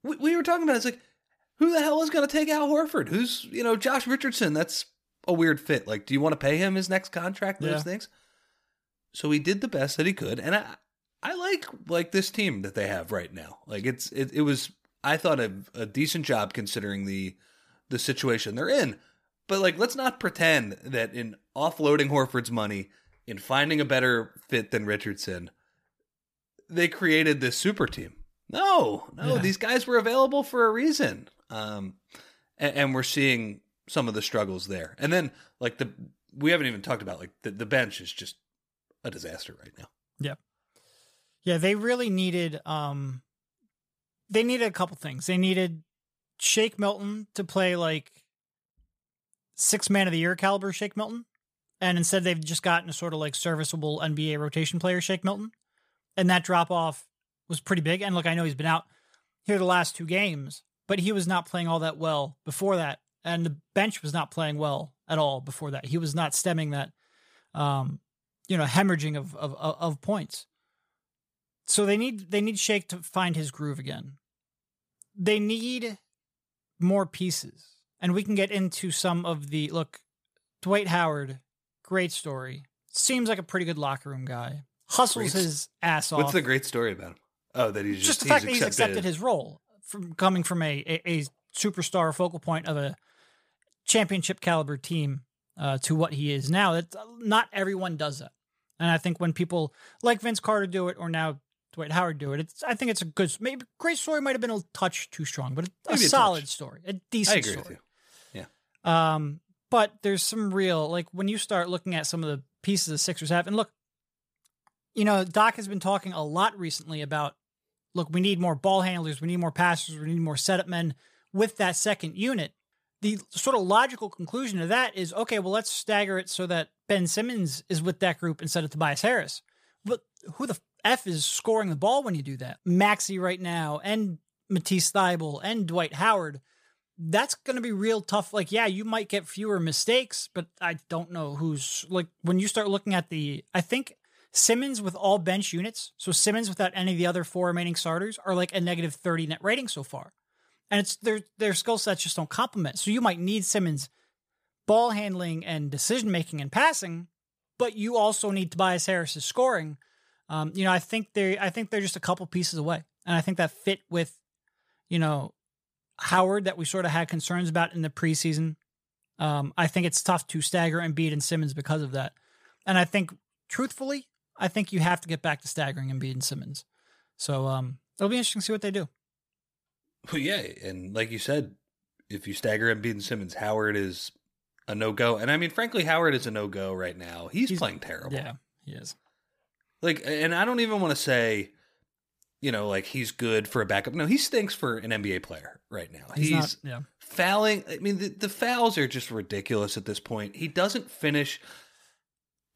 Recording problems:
none

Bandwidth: 15 kHz